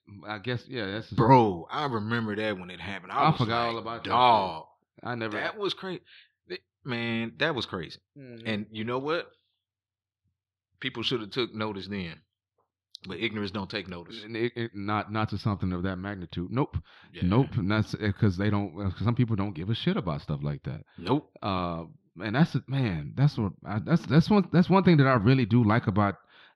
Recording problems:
muffled; very slightly; fading above 4 kHz

